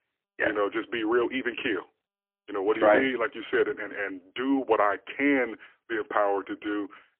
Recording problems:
phone-call audio; poor line; nothing above 3 kHz

